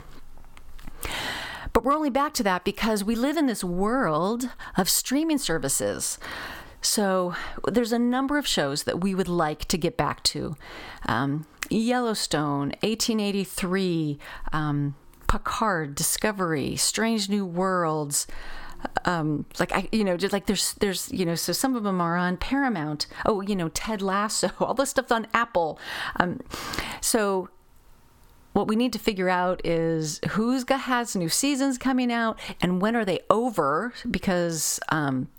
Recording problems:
squashed, flat; heavily

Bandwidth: 17 kHz